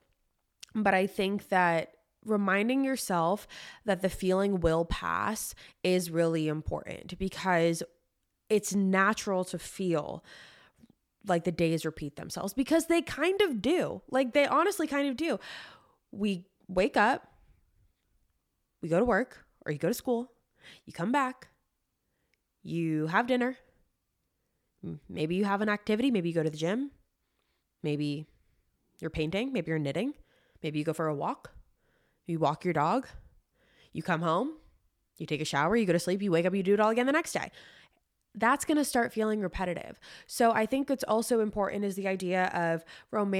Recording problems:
abrupt cut into speech; at the end

